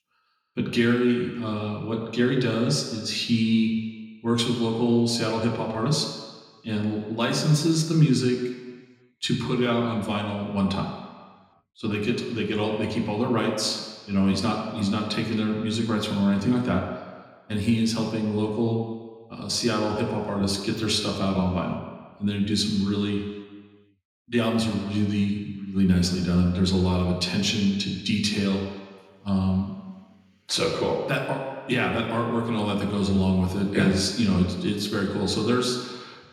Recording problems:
room echo; noticeable; dies away in 1.5 s
off-mic speech; somewhat distant

